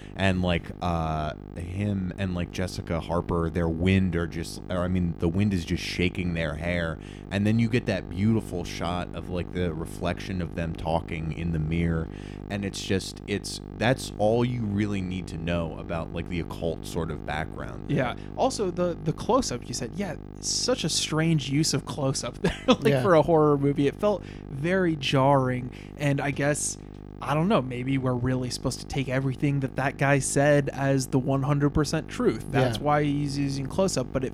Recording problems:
electrical hum; noticeable; throughout; 50 Hz, 20 dB below the speech

